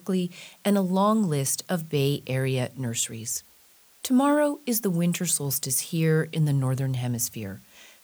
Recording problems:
hiss; faint; throughout; 30 dB below the speech

